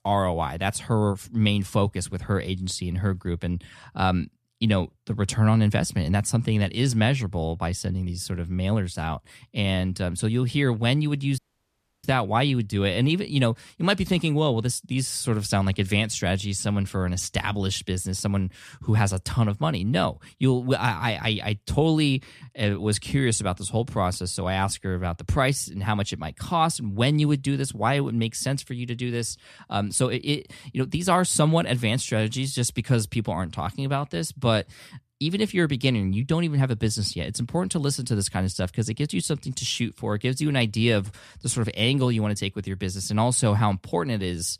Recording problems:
audio cutting out; at 11 s for 0.5 s

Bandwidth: 14 kHz